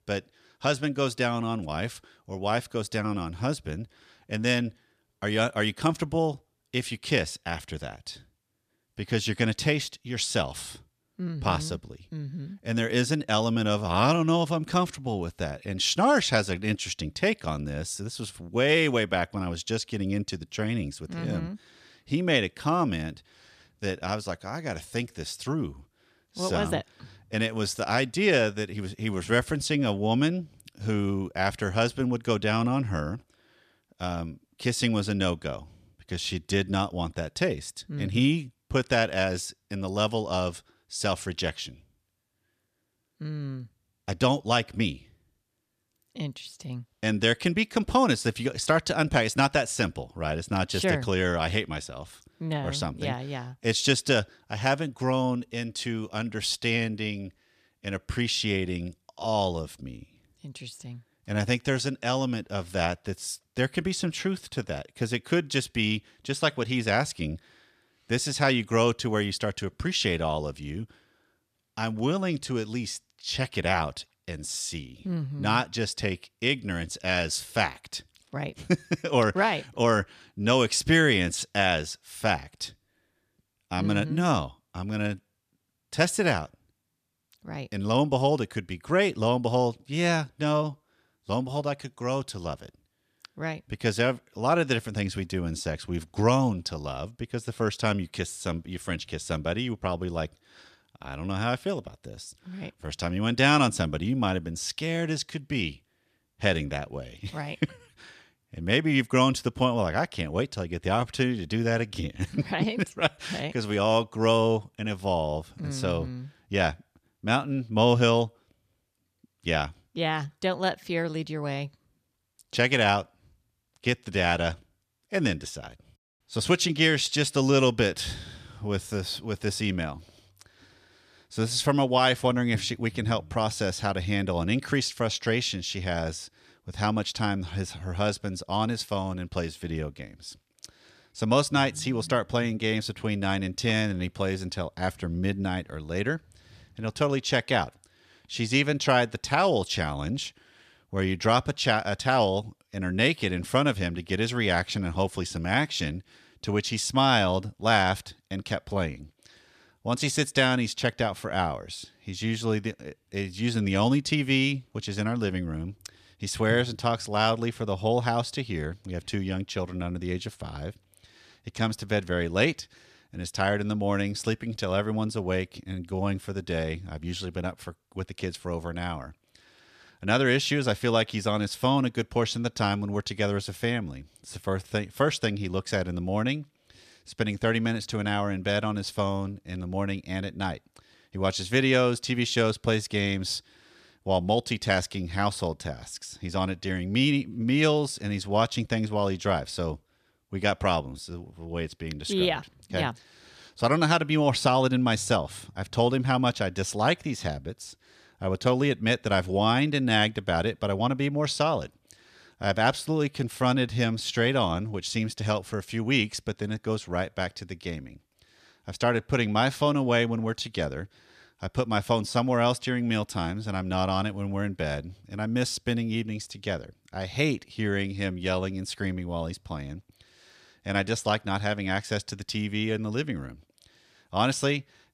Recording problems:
none

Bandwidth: 14.5 kHz